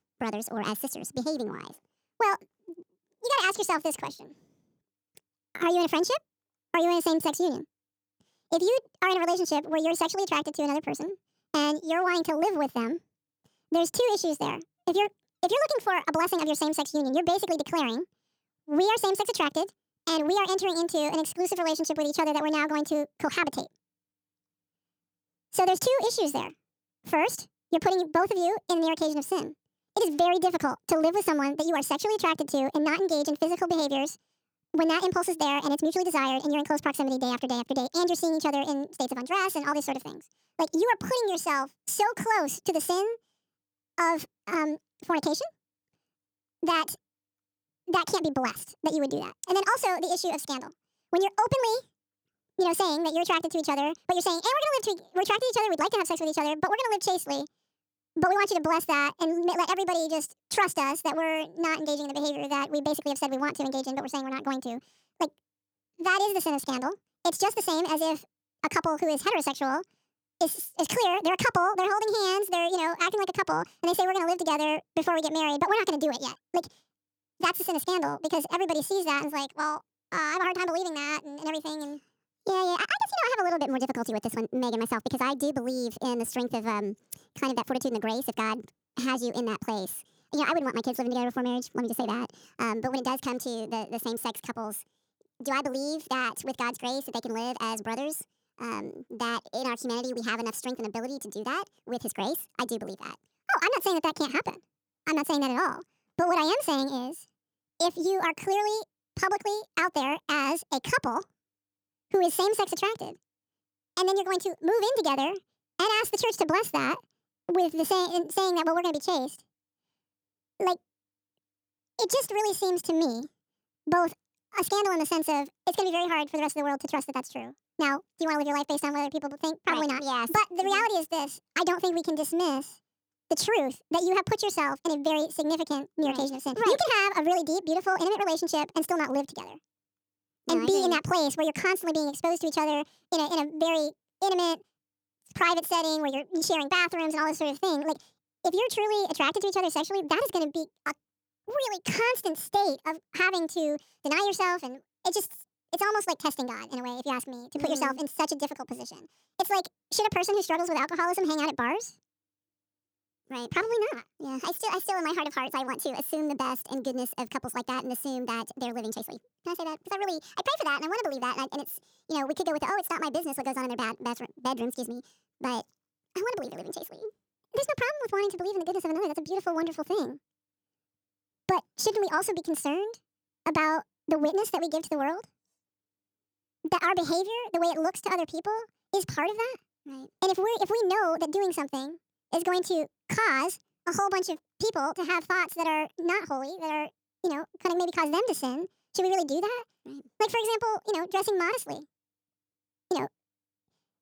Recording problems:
wrong speed and pitch; too fast and too high; 1.7 times normal speed

